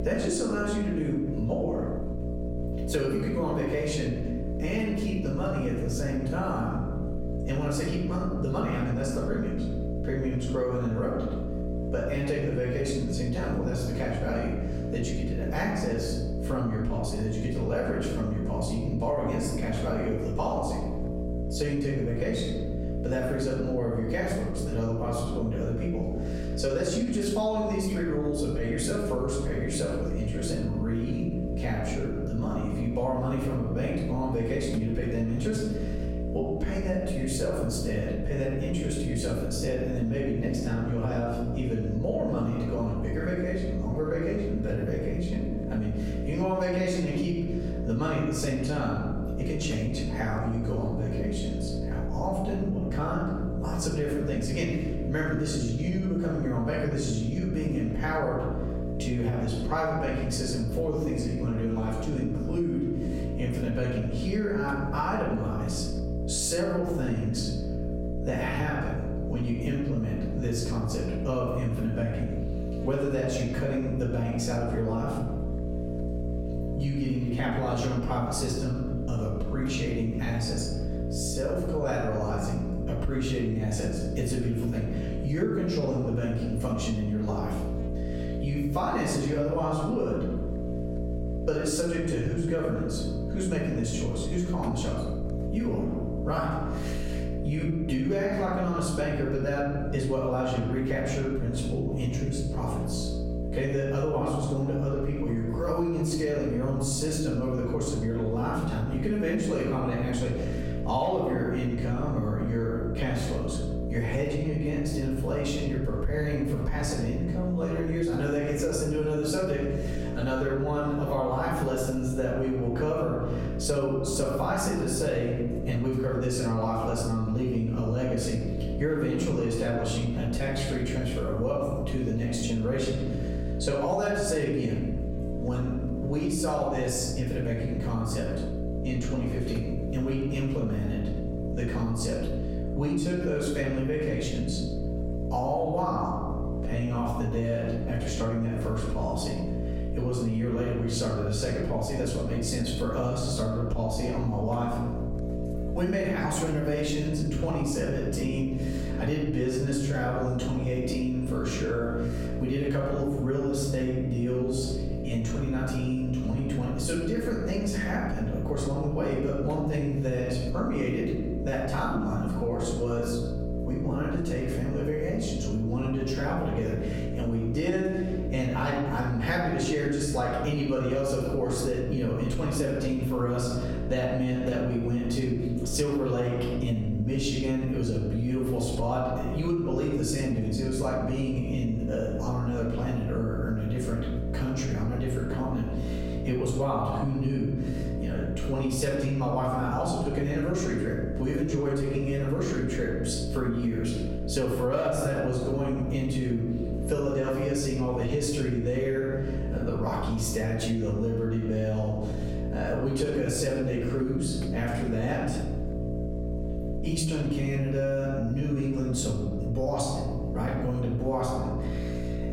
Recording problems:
off-mic speech; far
room echo; noticeable; dies away in 0.9 s
squashed, flat; somewhat
electrical hum; loud; throughout; 60 Hz, 10 dB below the speech

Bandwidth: 16 kHz